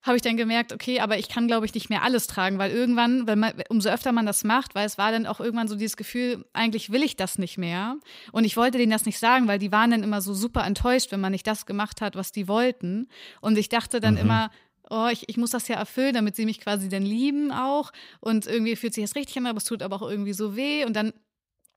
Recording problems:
none

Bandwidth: 15.5 kHz